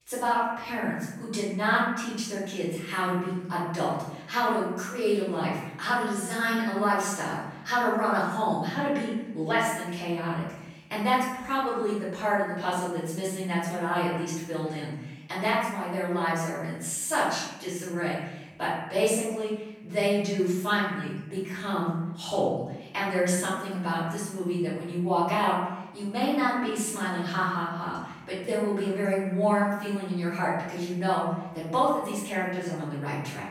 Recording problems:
room echo; strong; dies away in 0.9 s
off-mic speech; far

